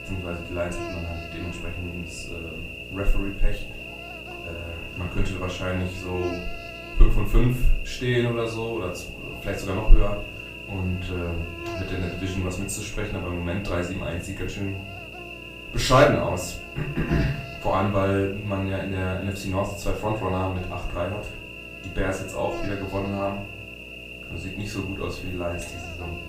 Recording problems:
off-mic speech; far
room echo; slight; dies away in 0.4 s
electrical hum; loud; throughout; 60 Hz, 7 dB below the speech

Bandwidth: 15.5 kHz